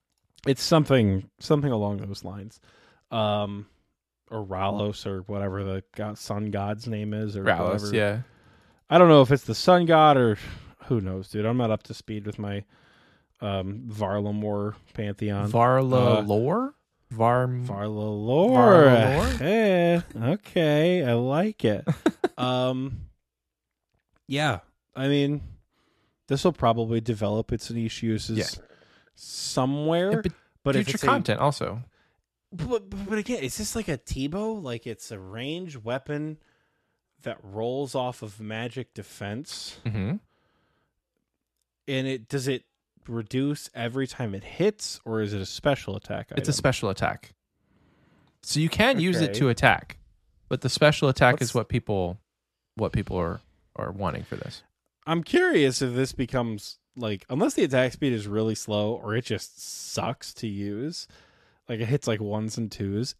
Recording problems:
none

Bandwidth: 13.5 kHz